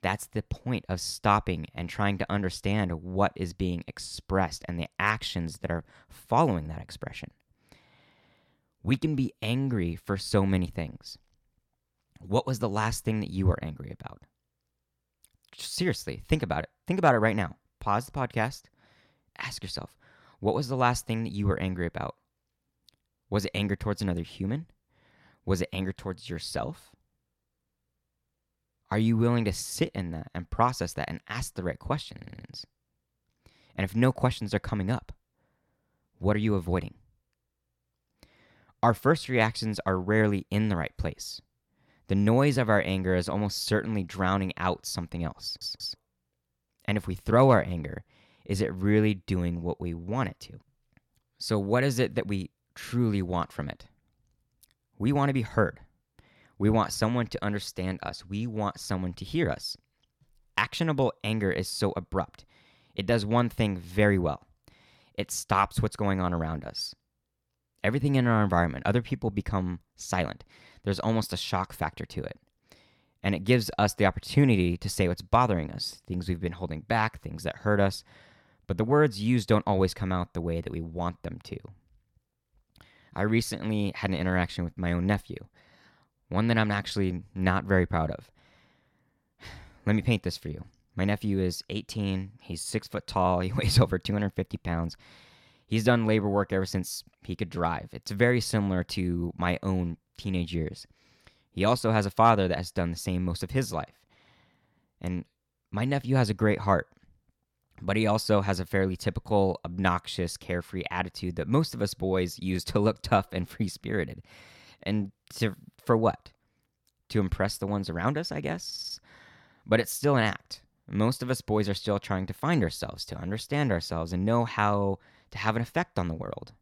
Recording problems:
audio stuttering; at 32 s, at 45 s and at 1:59

